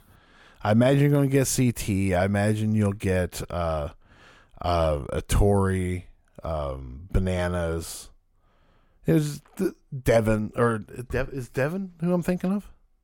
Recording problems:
none

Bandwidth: 17 kHz